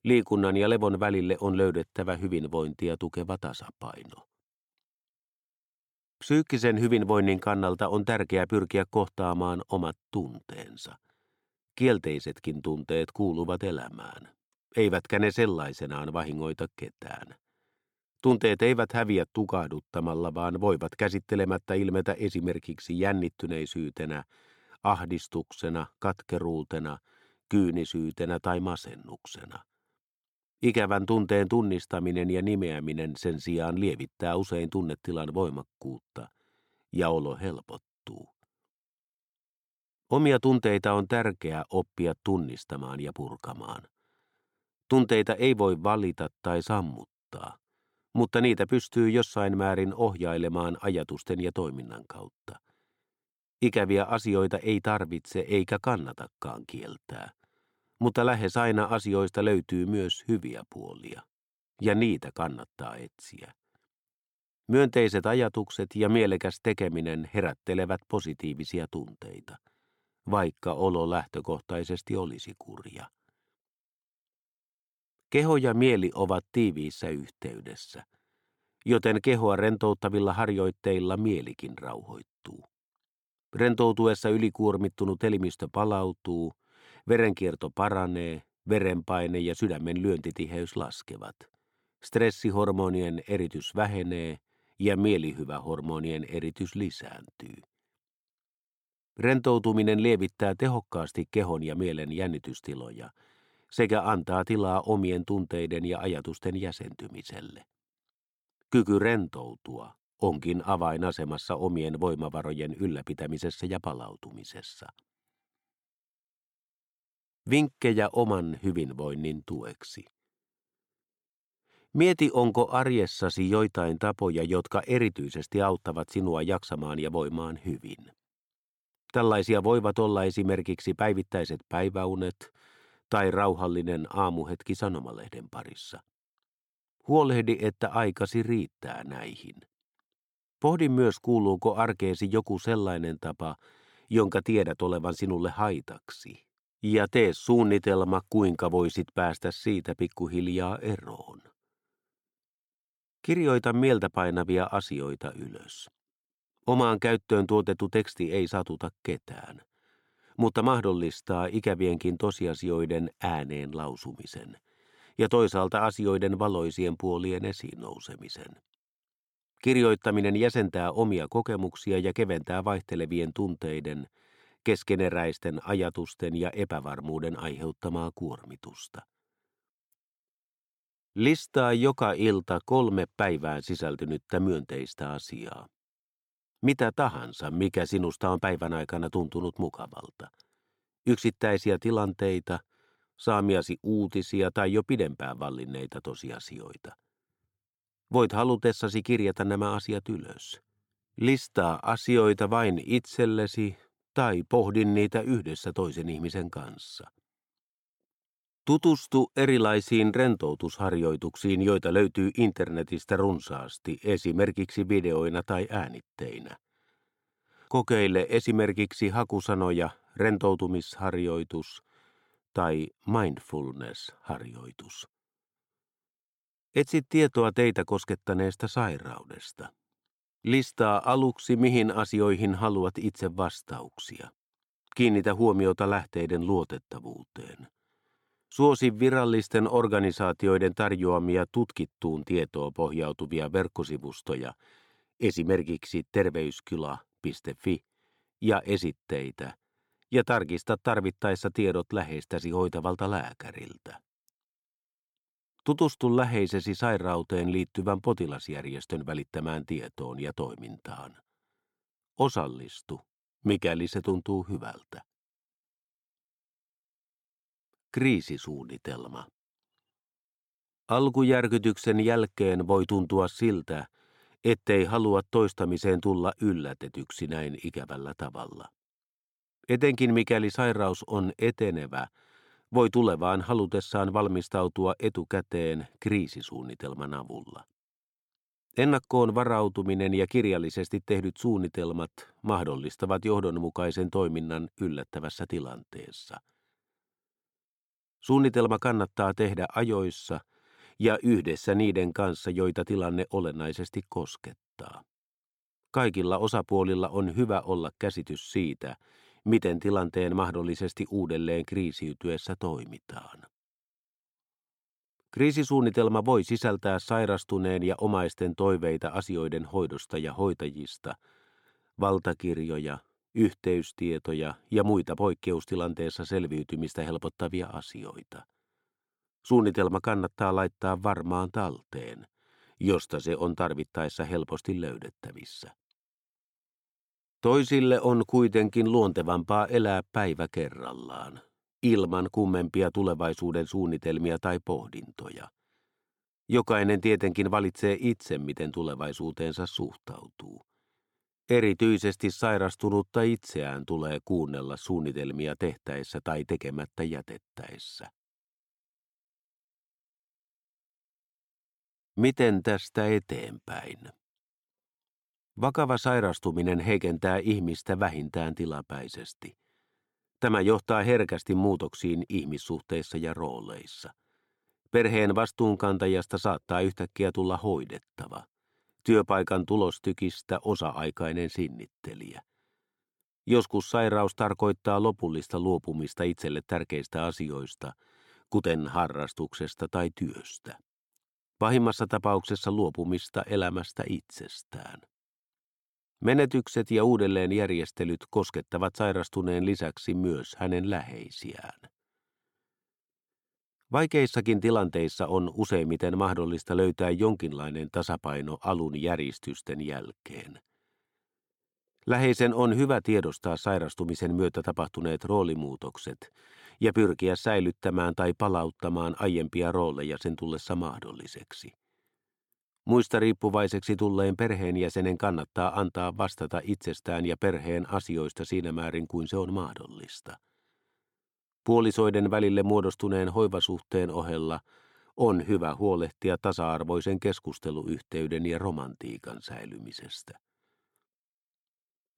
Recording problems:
none

